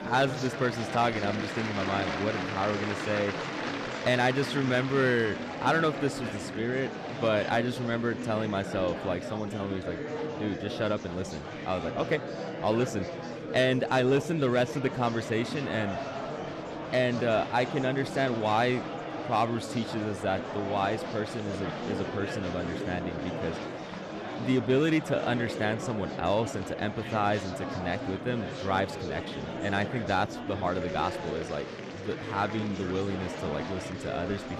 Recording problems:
murmuring crowd; loud; throughout; 6 dB below the speech

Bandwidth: 13.5 kHz